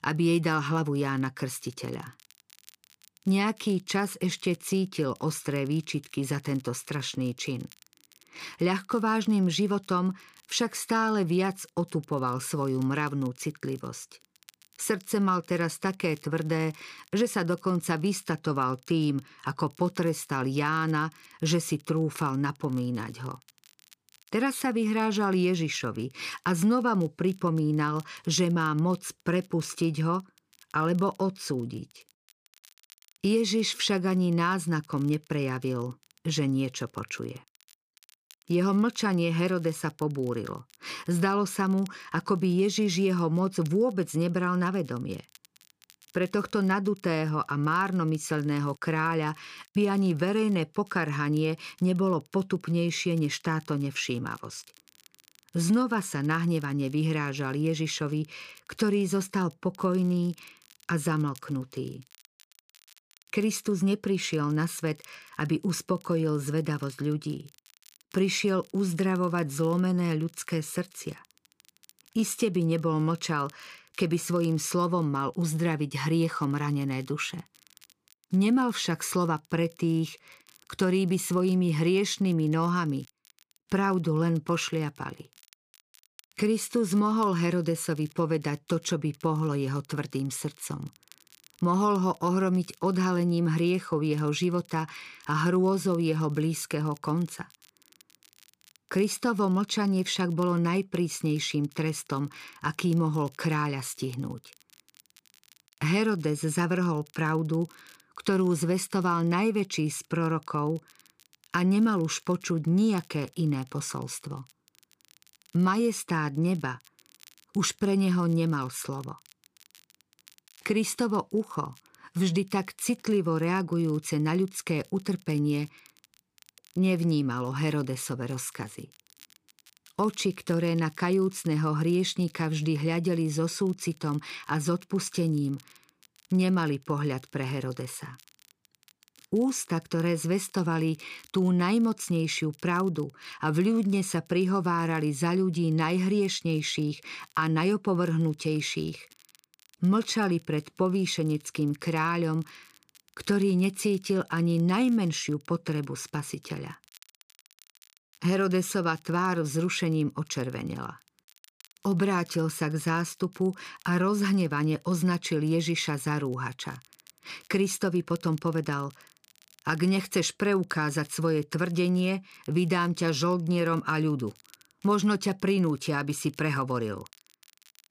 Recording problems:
crackle, like an old record; faint; 30 dB below the speech

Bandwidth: 15 kHz